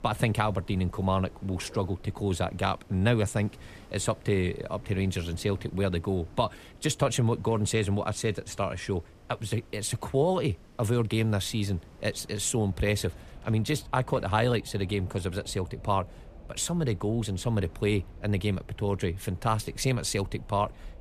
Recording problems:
wind in the background; faint; throughout; 20 dB below the speech

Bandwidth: 14.5 kHz